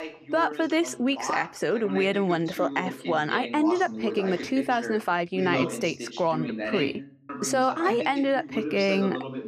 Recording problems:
voice in the background; loud; throughout; 8 dB below the speech

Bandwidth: 14.5 kHz